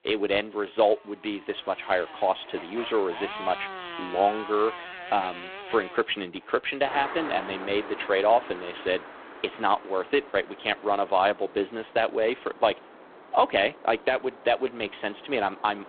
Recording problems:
phone-call audio; poor line
traffic noise; noticeable; throughout; 15 dB below the speech

